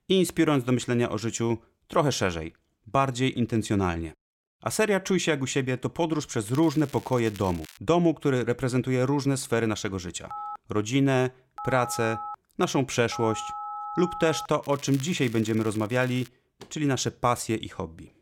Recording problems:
crackling; faint; from 6.5 to 8 s and from 15 to 16 s; 20 dB below the speech
phone ringing; noticeable; from 10 to 14 s; peak 8 dB below the speech

